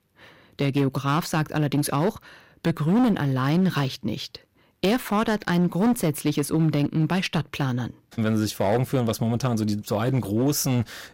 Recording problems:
distortion; slight; 11% of the sound clipped

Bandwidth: 16 kHz